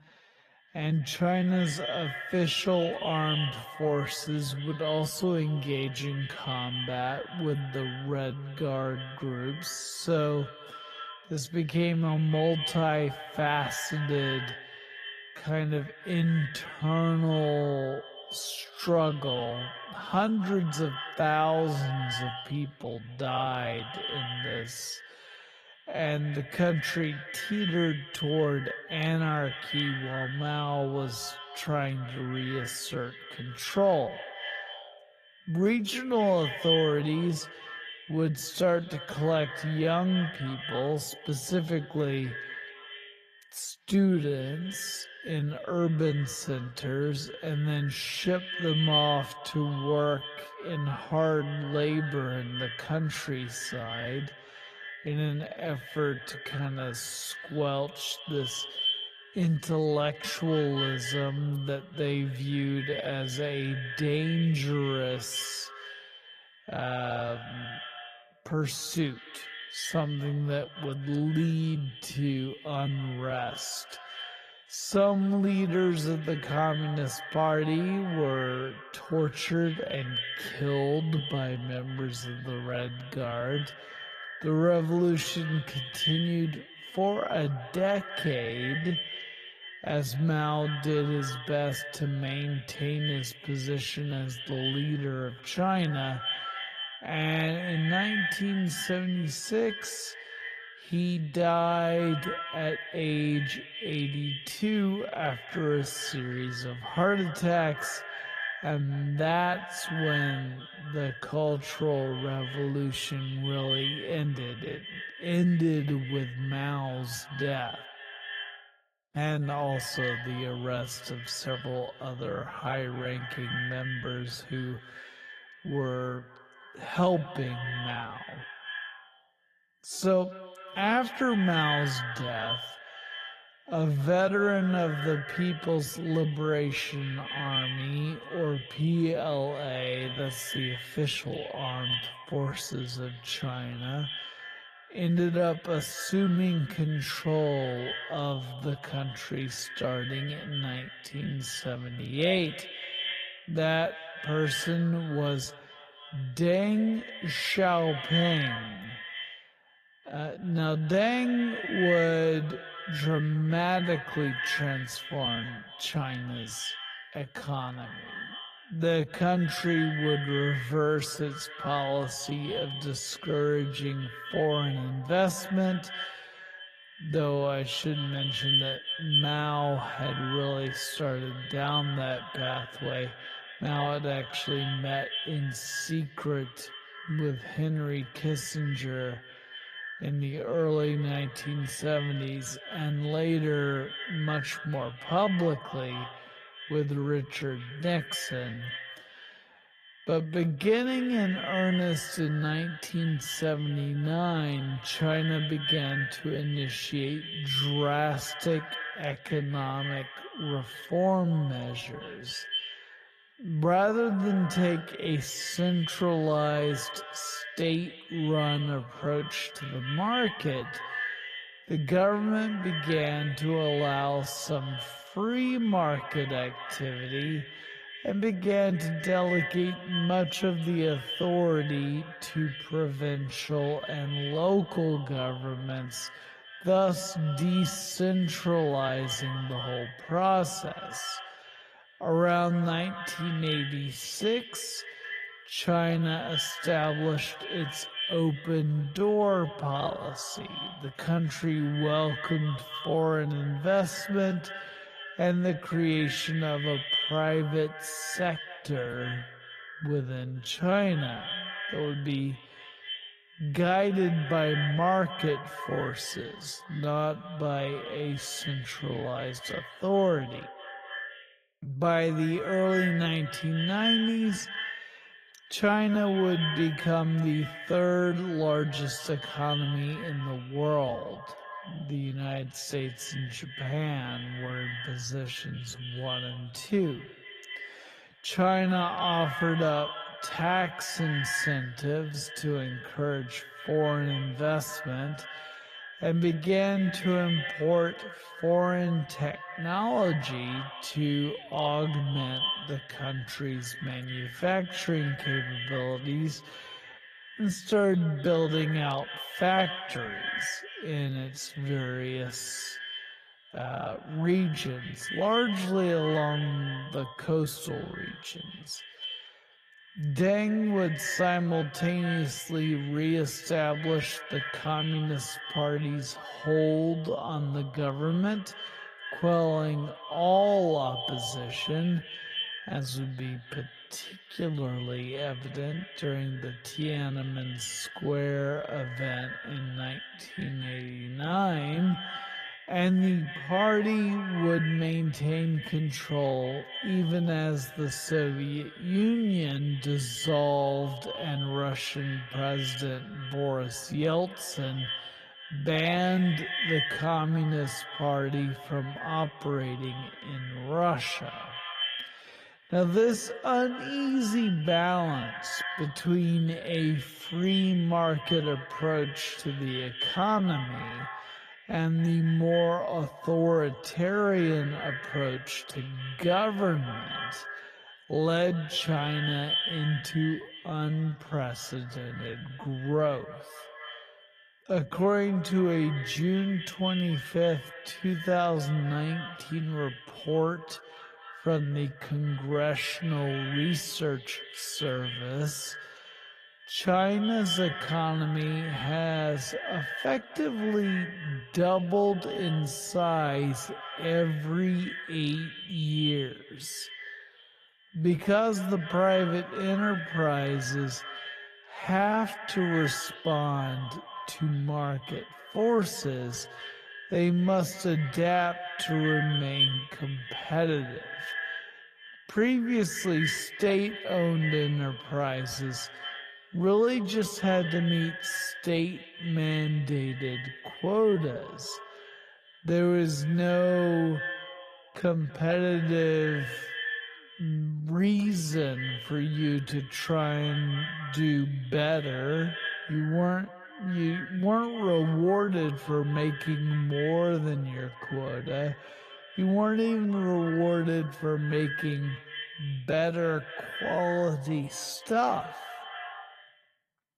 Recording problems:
echo of what is said; strong; throughout; 250 ms later, 8 dB below the speech
wrong speed, natural pitch; too slow; 0.5 times normal speed
garbled, watery; slightly; nothing above 15 kHz

